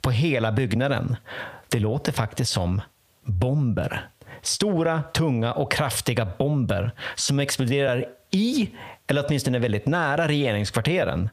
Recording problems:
squashed, flat; heavily

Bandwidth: 15 kHz